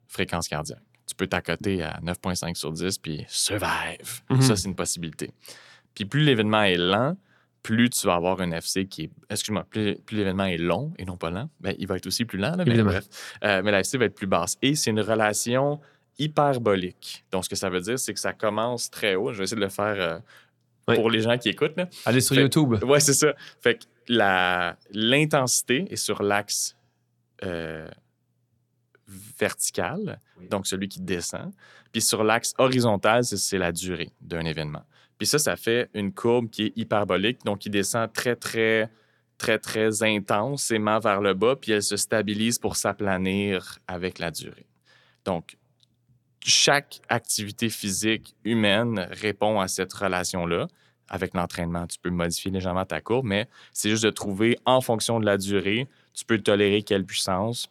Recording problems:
none

